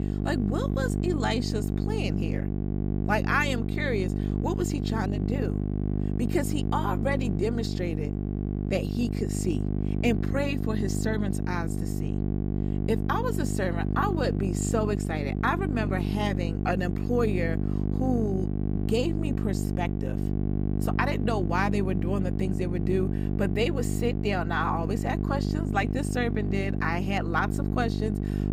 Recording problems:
electrical hum; loud; throughout; 50 Hz, 6 dB below the speech

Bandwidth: 15.5 kHz